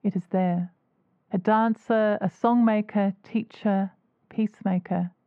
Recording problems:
muffled; very; fading above 1 kHz

